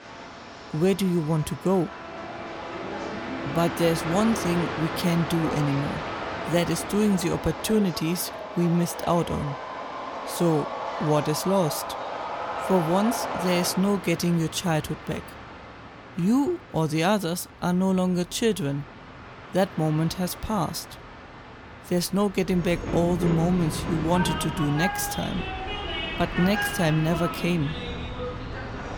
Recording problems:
train or aircraft noise; loud; throughout; 7 dB below the speech

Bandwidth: 18.5 kHz